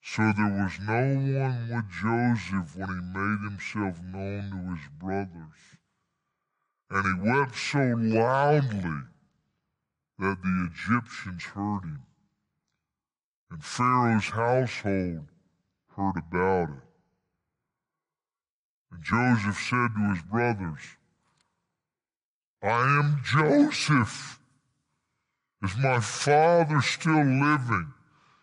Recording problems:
wrong speed and pitch; too slow and too low; 0.7 times normal speed

